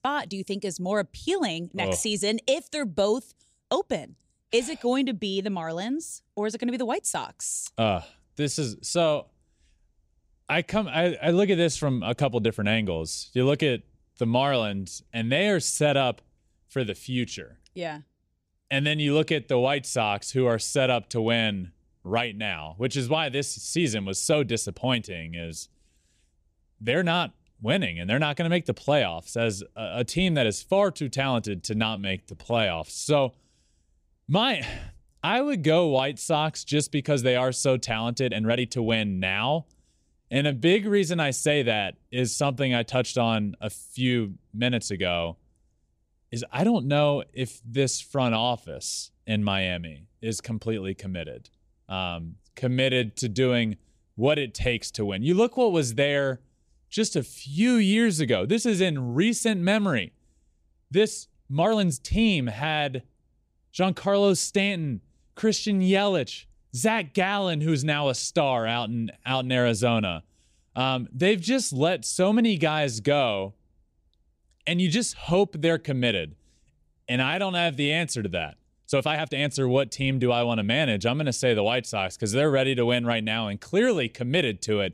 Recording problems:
uneven, jittery; strongly; from 25 s to 1:19

